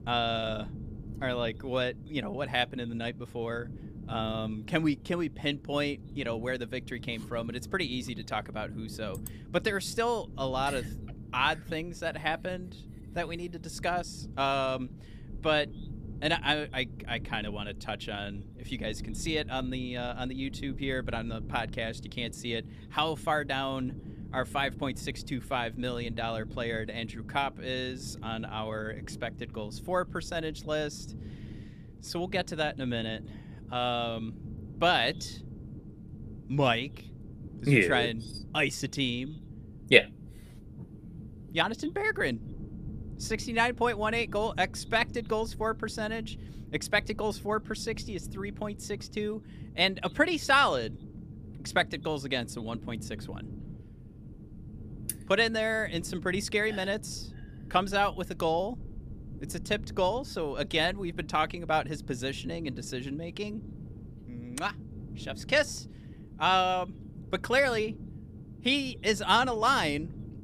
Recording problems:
low rumble; faint; throughout; 25 dB below the speech

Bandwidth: 15 kHz